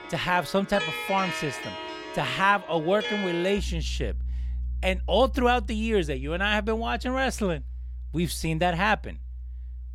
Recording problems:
background music; loud; throughout; 8 dB below the speech

